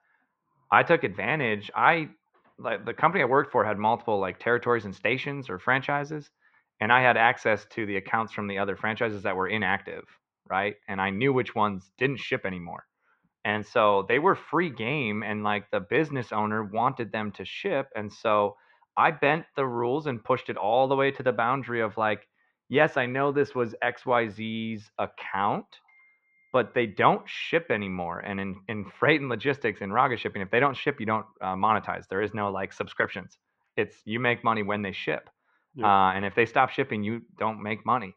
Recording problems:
muffled; very; fading above 2.5 kHz

